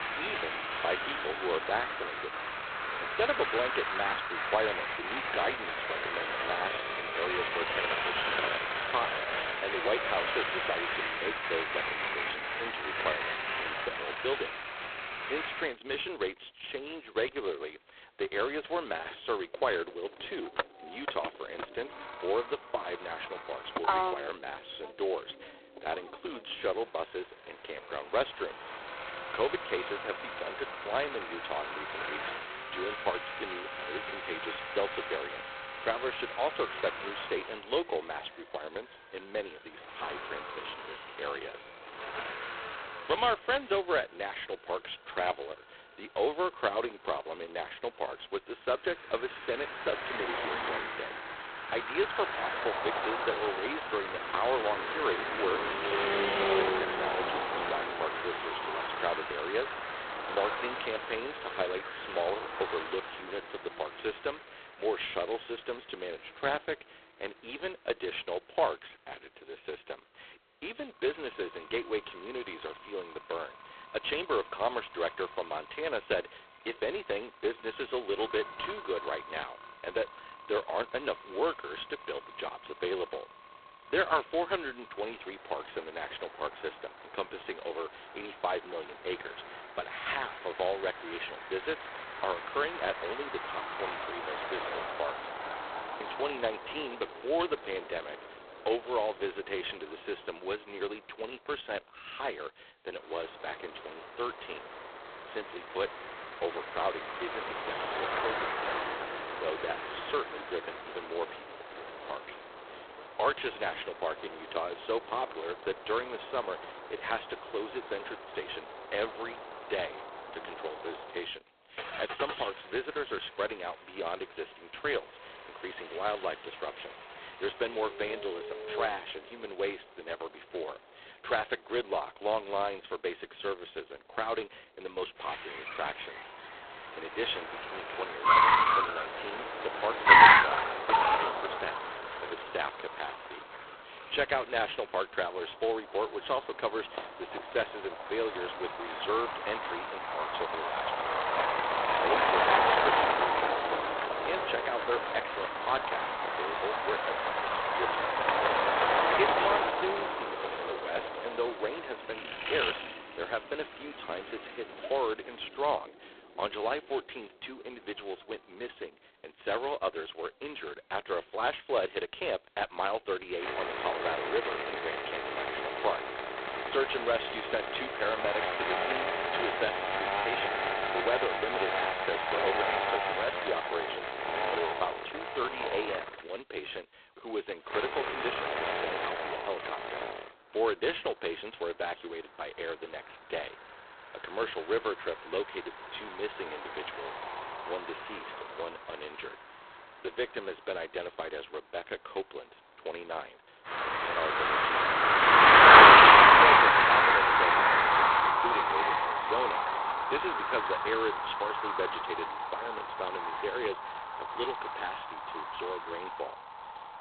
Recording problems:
phone-call audio; poor line; nothing above 4 kHz
traffic noise; very loud; throughout; 8 dB above the speech

